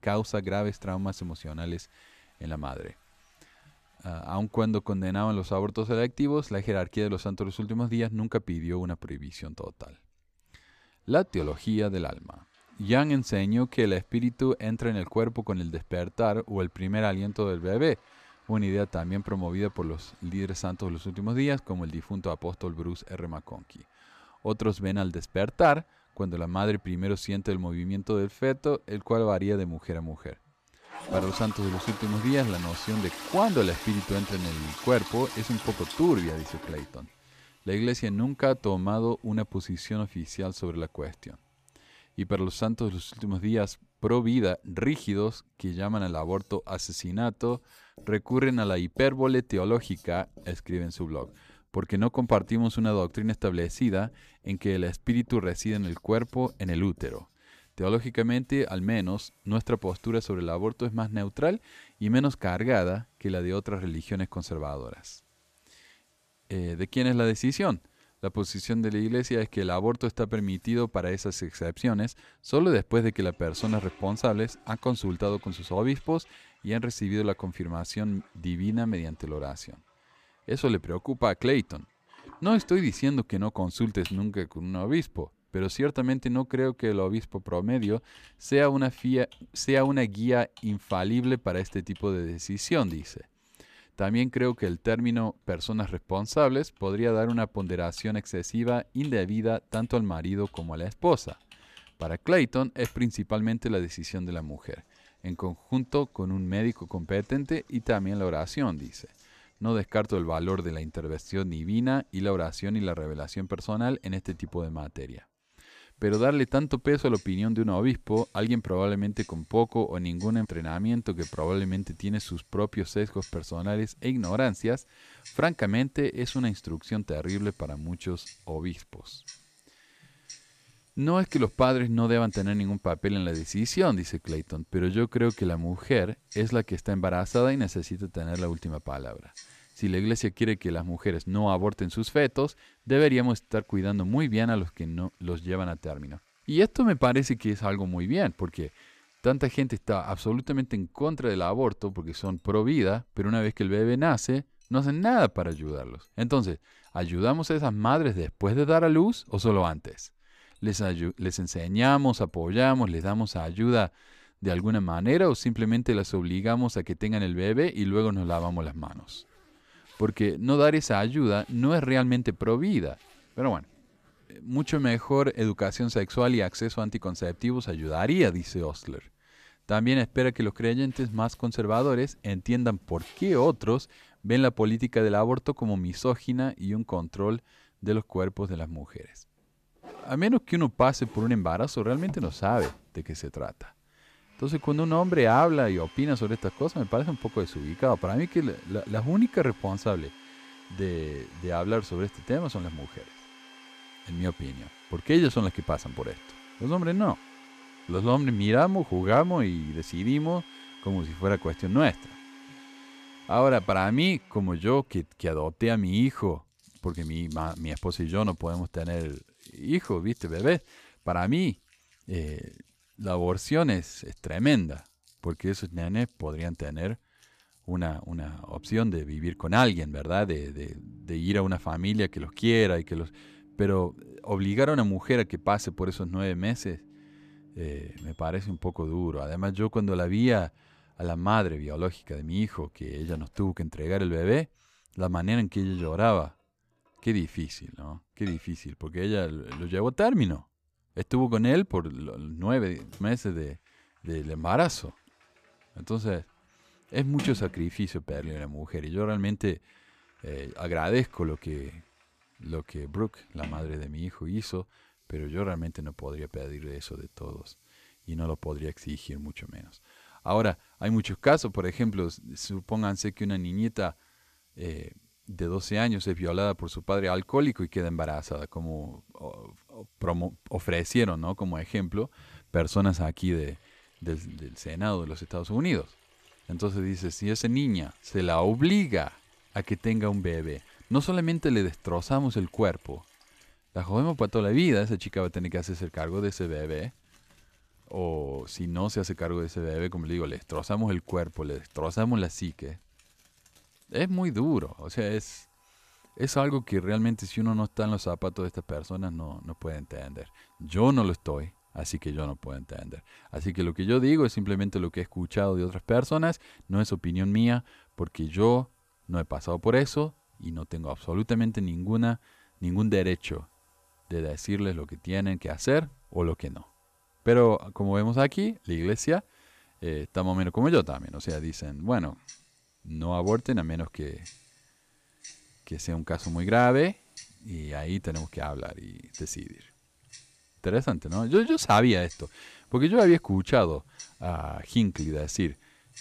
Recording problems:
household noises; faint; throughout; 20 dB below the speech

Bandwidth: 14.5 kHz